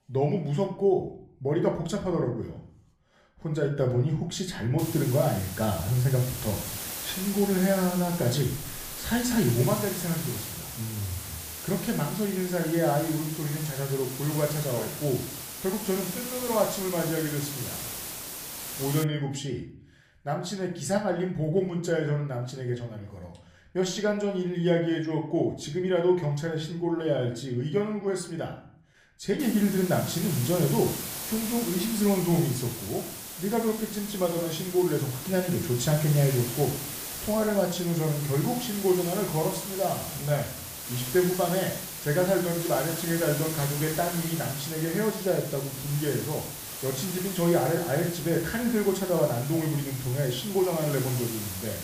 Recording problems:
room echo; slight; dies away in 0.5 s
off-mic speech; somewhat distant
hiss; loud; from 5 to 19 s and from 29 s on; 7 dB below the speech

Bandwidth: 15 kHz